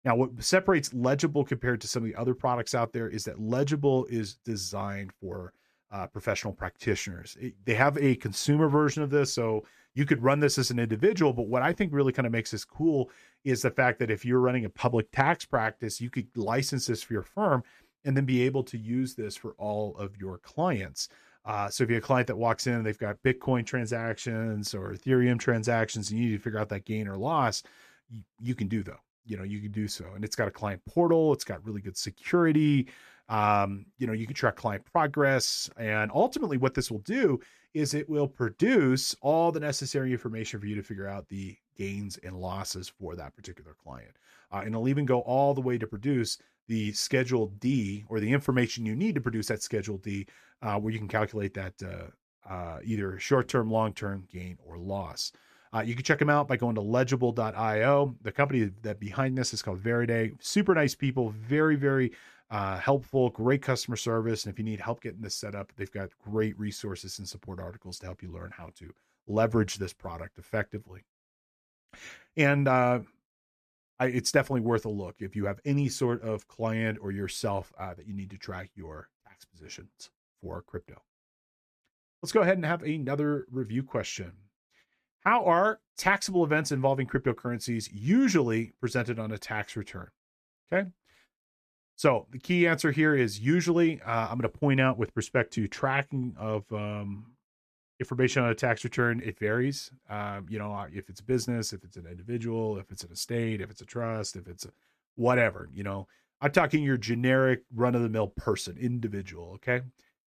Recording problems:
none

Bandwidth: 14.5 kHz